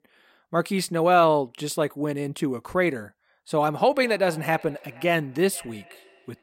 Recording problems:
echo of what is said; faint; from 3.5 s on; 480 ms later, 25 dB below the speech

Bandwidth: 16 kHz